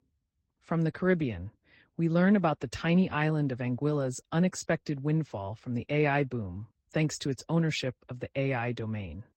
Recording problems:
garbled, watery; slightly; nothing above 16 kHz

